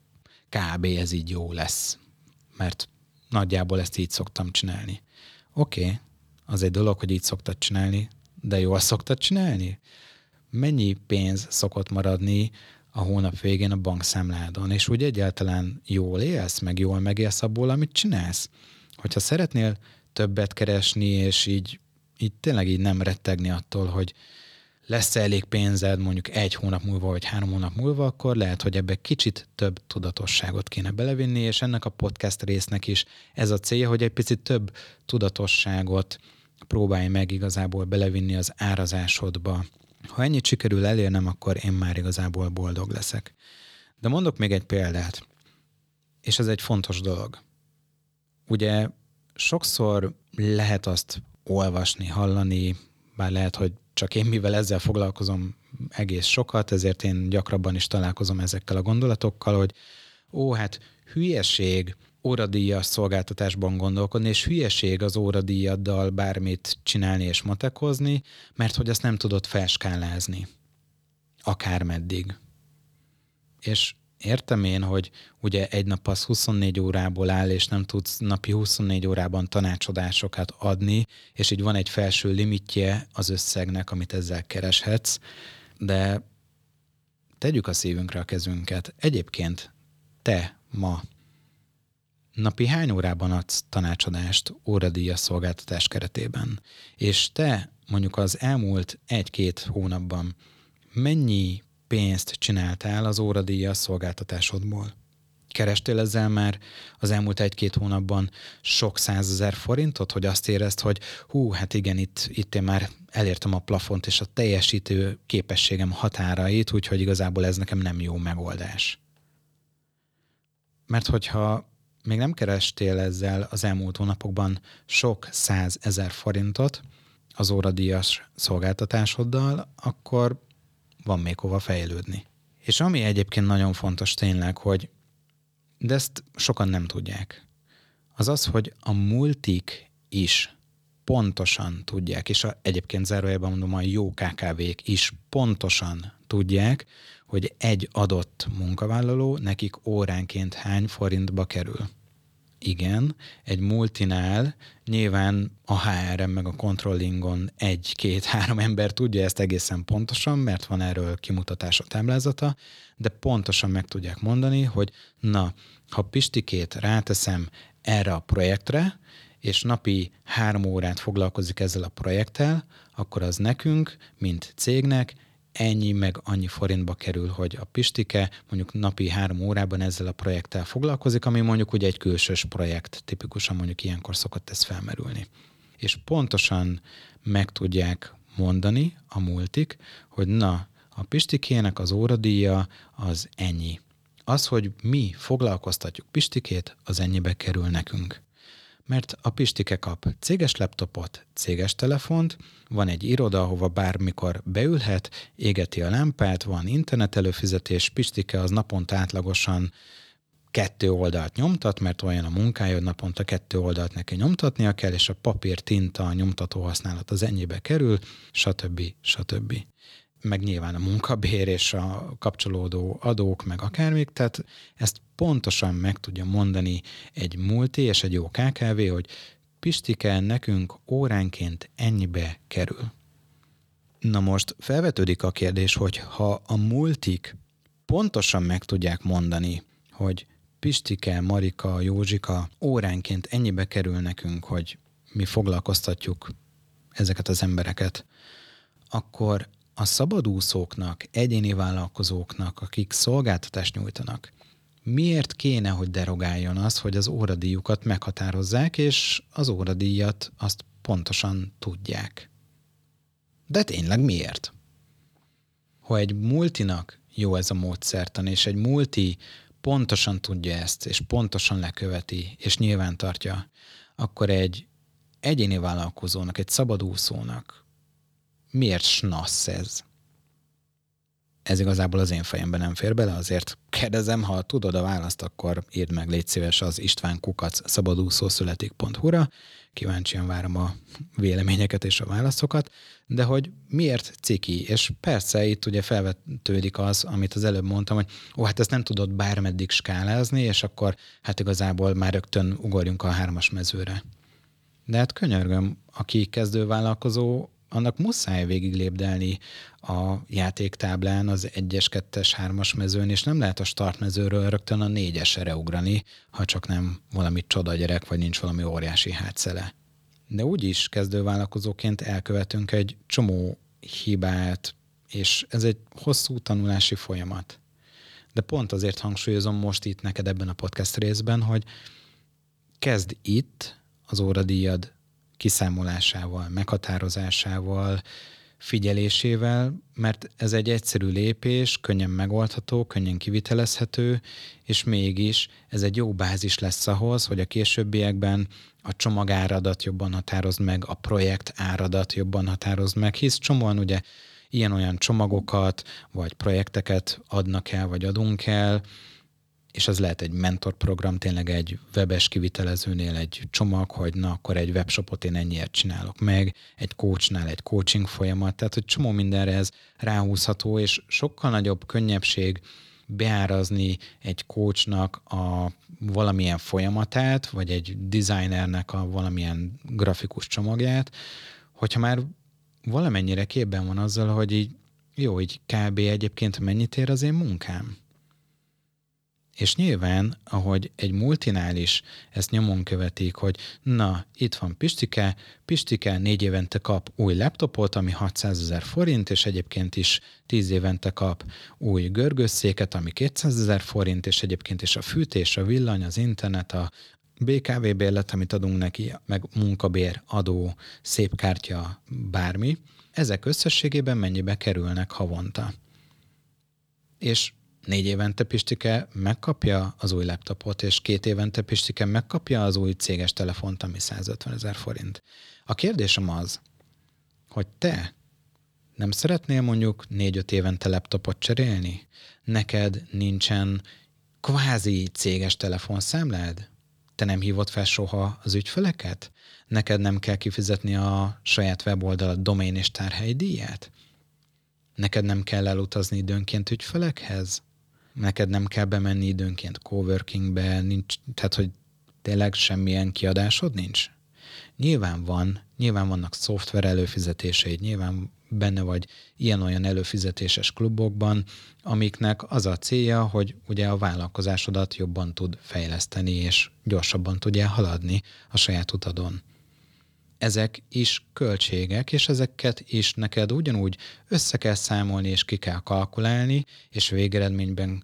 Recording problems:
none

